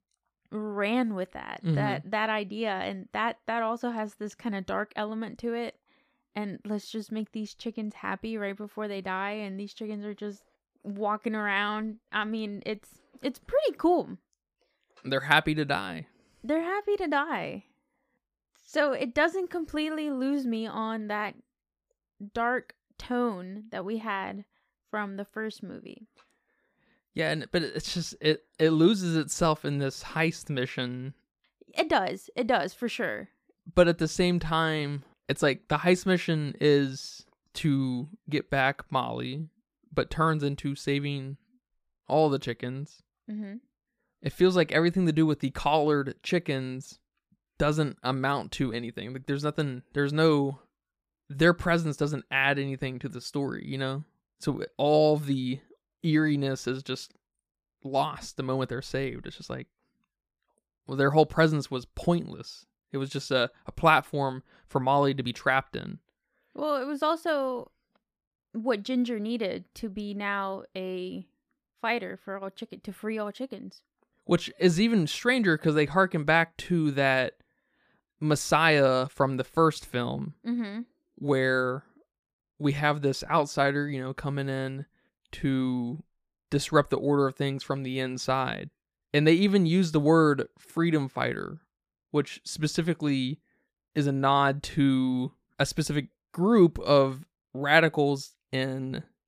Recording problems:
none

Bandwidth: 15 kHz